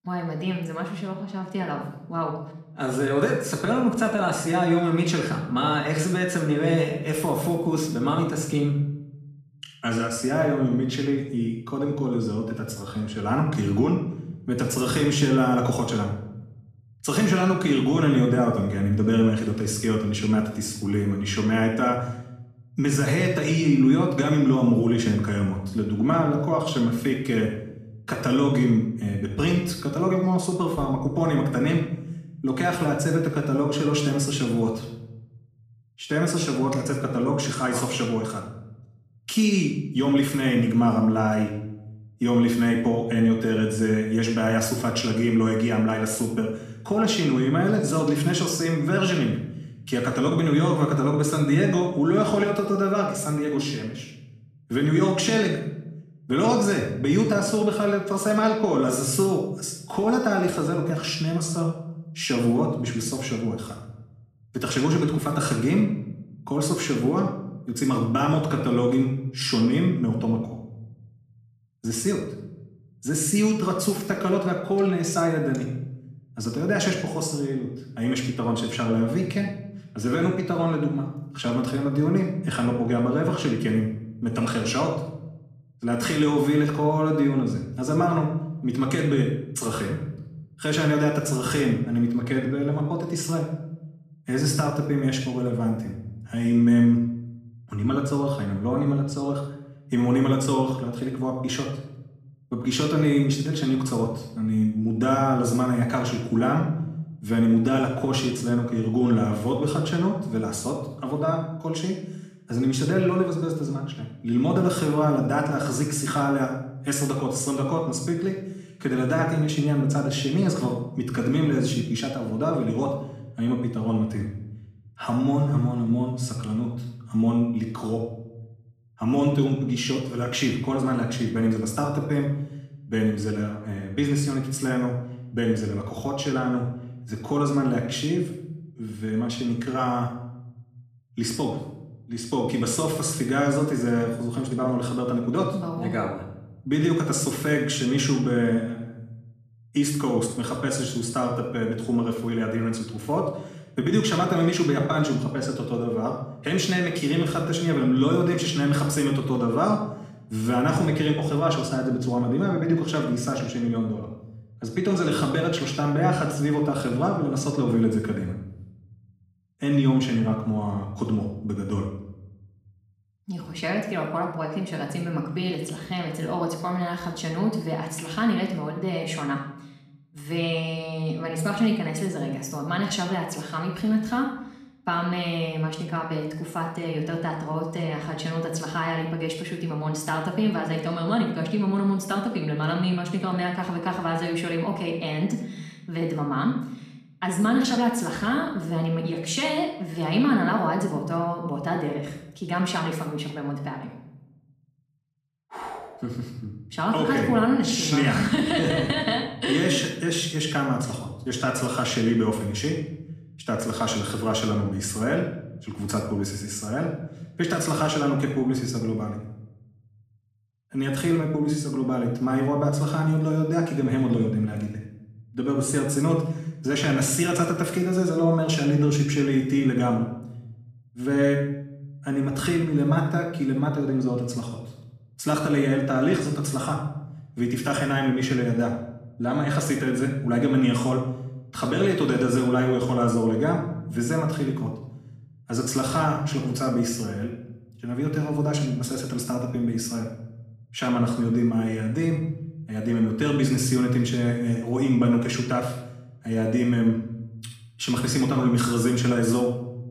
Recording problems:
off-mic speech; far
room echo; noticeable; dies away in 0.9 s

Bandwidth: 14.5 kHz